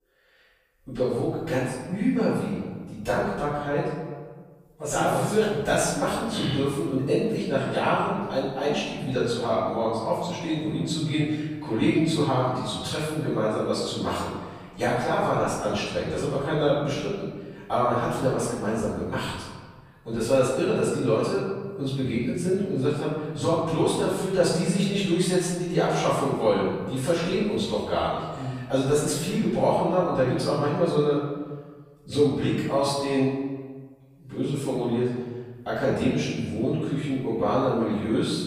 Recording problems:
room echo; strong; dies away in 1.5 s
off-mic speech; far

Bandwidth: 15 kHz